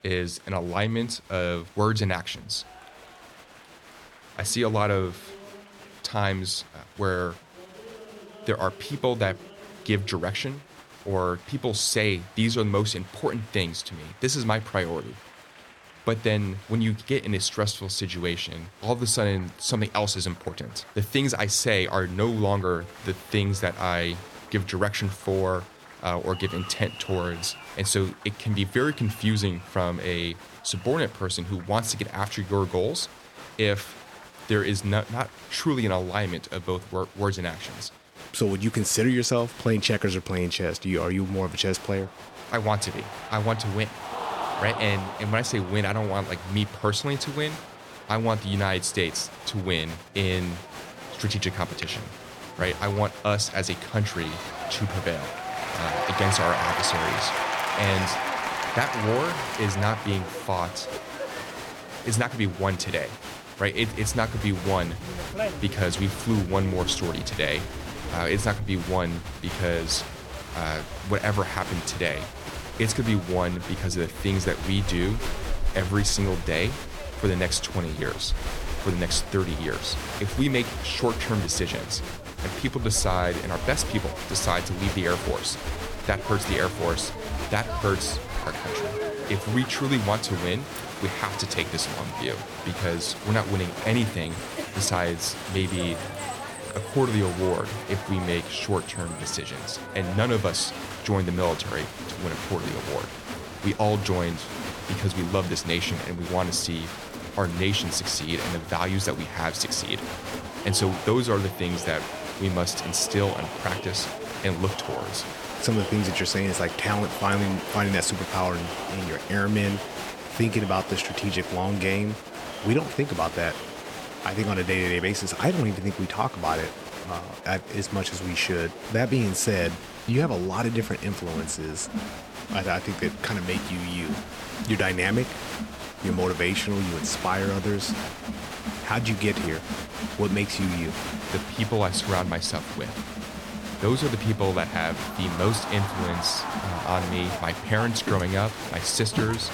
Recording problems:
crowd noise; loud; throughout; 7 dB below the speech

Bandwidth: 17.5 kHz